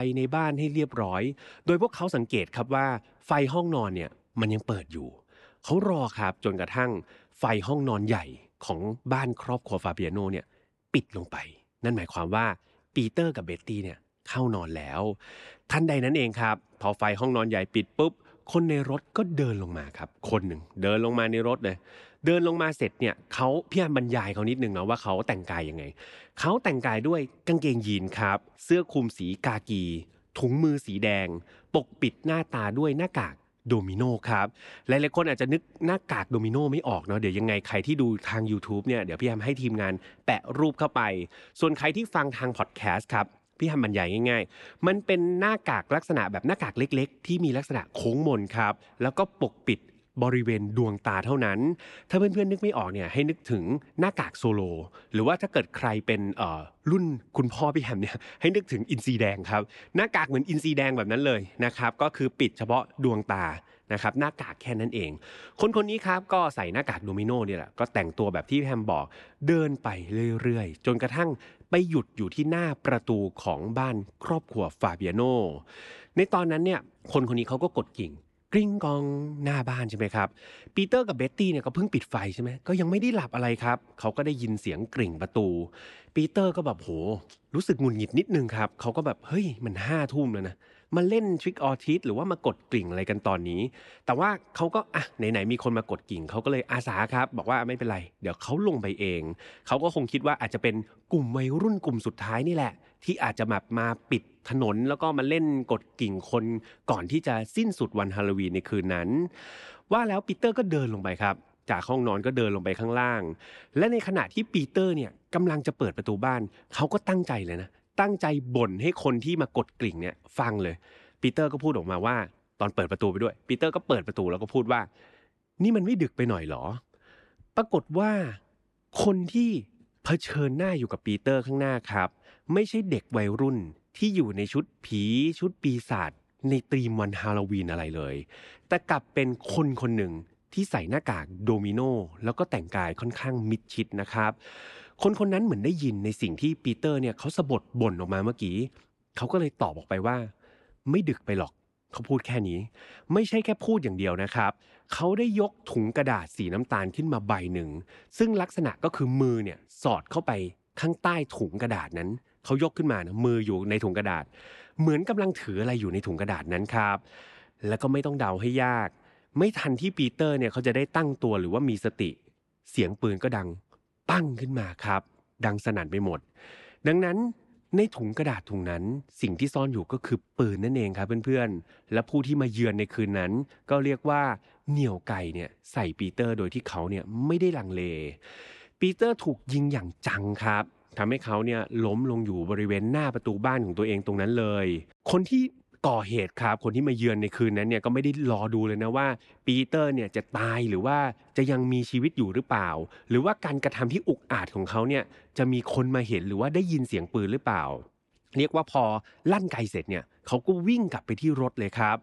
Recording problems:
abrupt cut into speech; at the start

